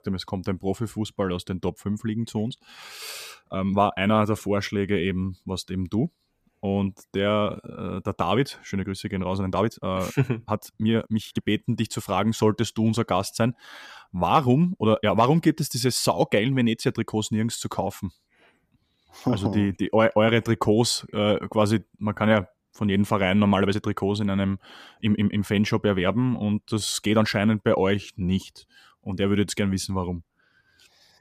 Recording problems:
uneven, jittery; strongly; from 3.5 to 28 s

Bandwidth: 14.5 kHz